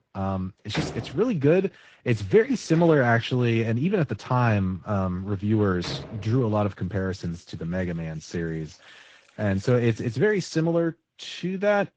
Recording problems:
garbled, watery; slightly
household noises; noticeable; throughout; 15 dB below the speech

